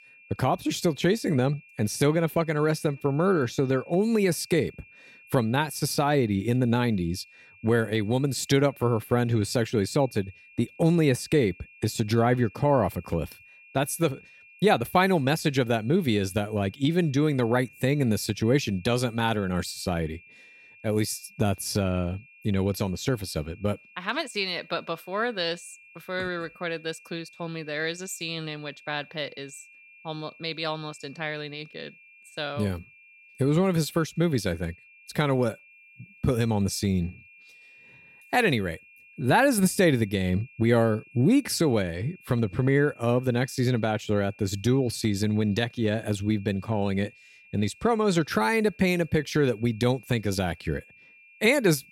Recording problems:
high-pitched whine; faint; throughout; 2.5 kHz, 25 dB below the speech

